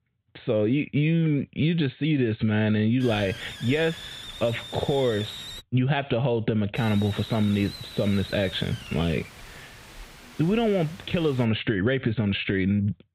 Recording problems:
high frequencies cut off; severe; nothing above 4 kHz
squashed, flat; somewhat
hiss; noticeable; from 3 to 5.5 s and from 7 to 11 s; 15 dB below the speech

